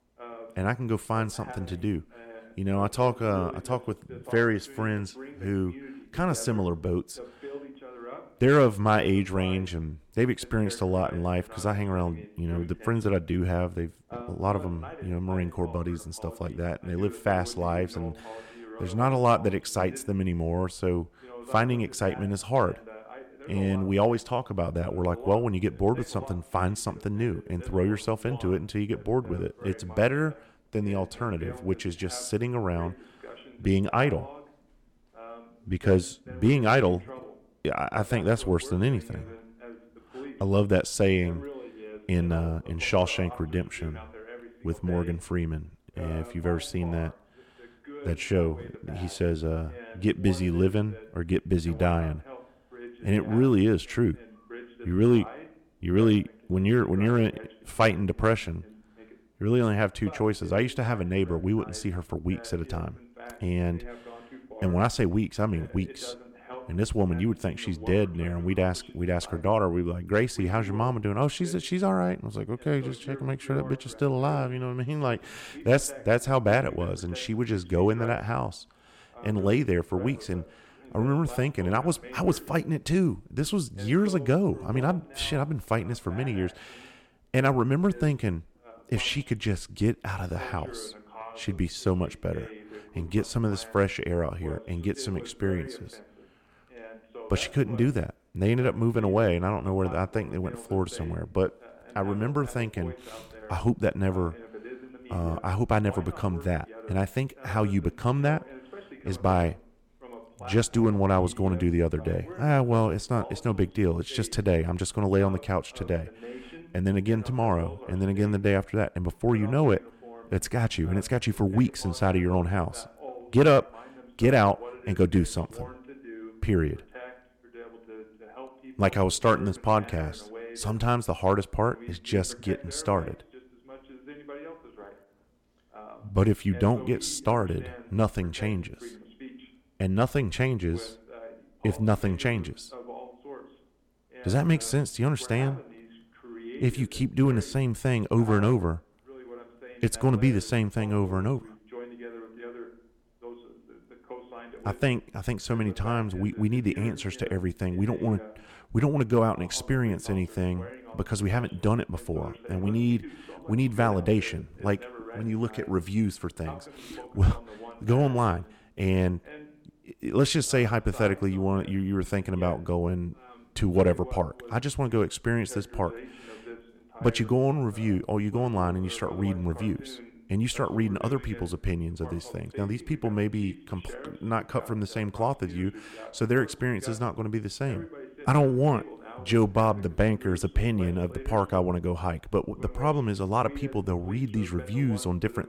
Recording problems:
voice in the background; noticeable; throughout; 20 dB below the speech

